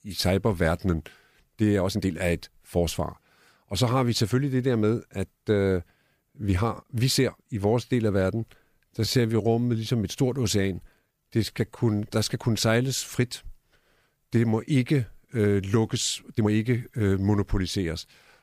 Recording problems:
uneven, jittery; strongly; from 2 to 17 s

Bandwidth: 15 kHz